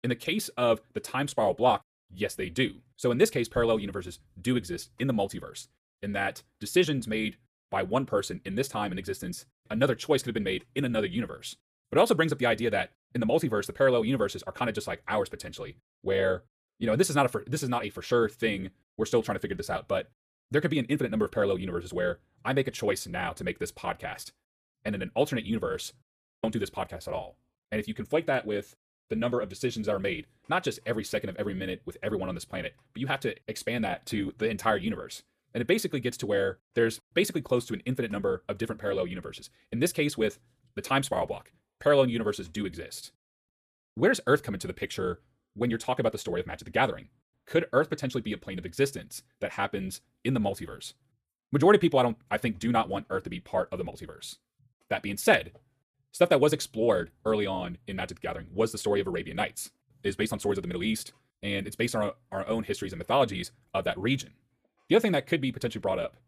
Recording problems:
wrong speed, natural pitch; too fast; 1.5 times normal speed

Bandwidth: 14.5 kHz